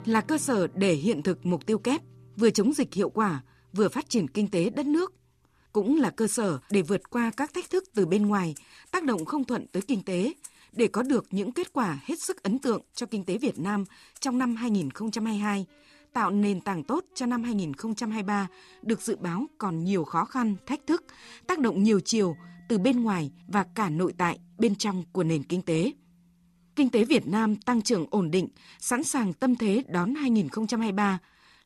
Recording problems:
background music; faint; throughout; 25 dB below the speech

